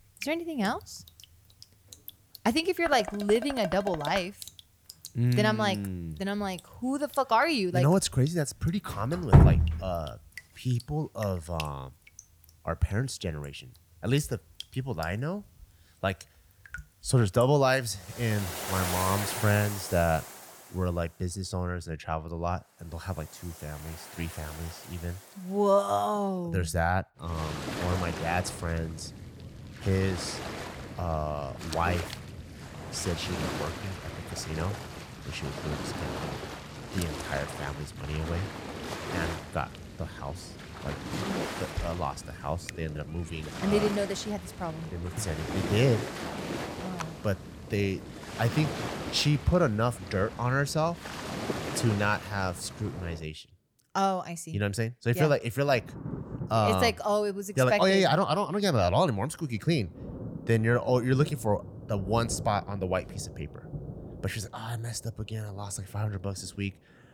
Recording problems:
rain or running water; loud; throughout; 6 dB below the speech
clattering dishes; noticeable; from 3 to 4 s; peak 7 dB below the speech

